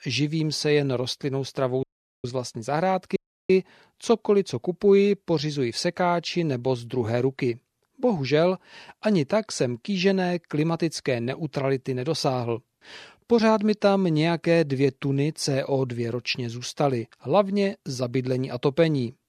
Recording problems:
audio cutting out; at 2 s and at 3 s

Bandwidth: 14 kHz